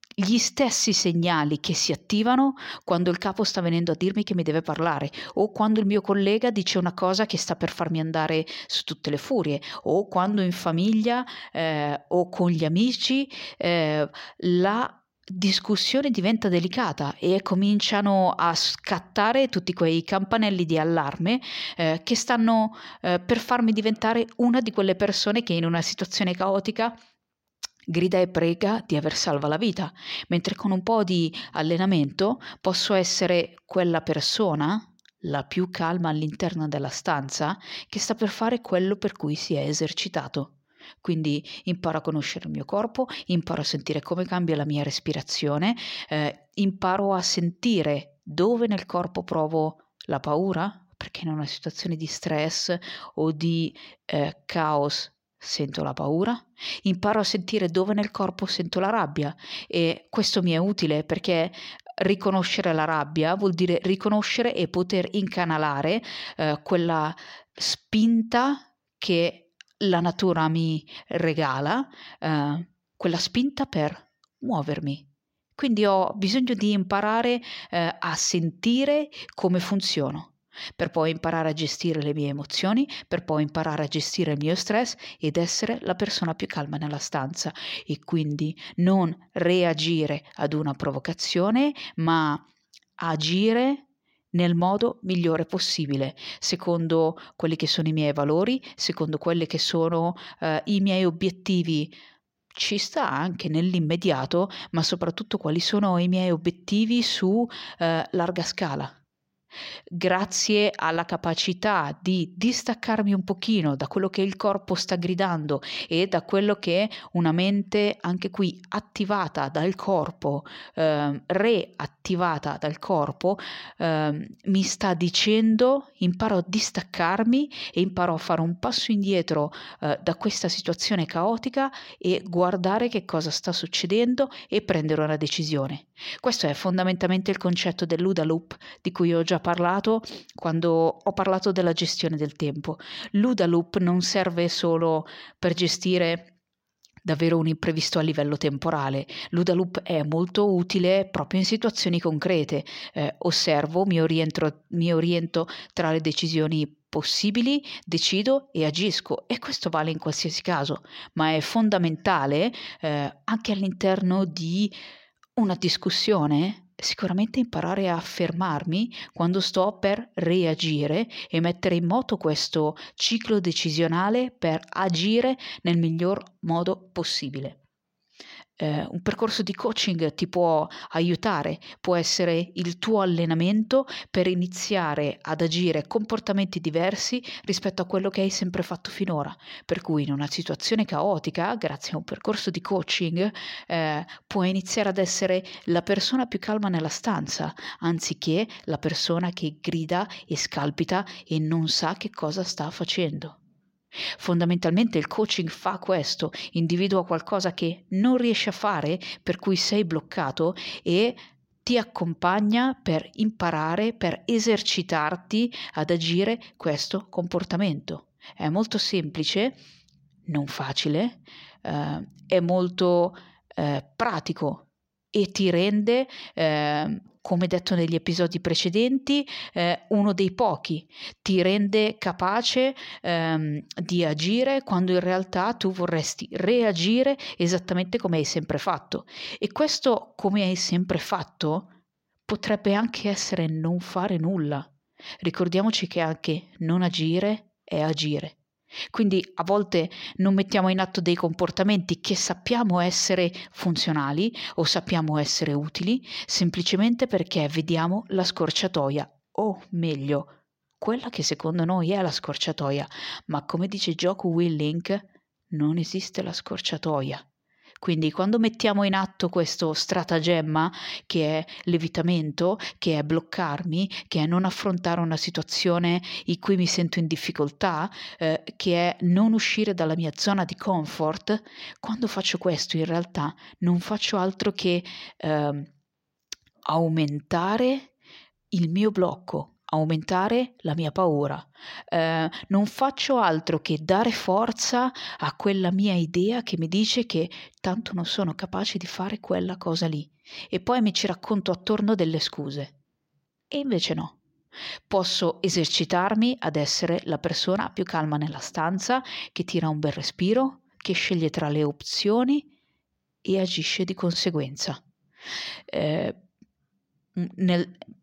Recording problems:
none

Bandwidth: 16 kHz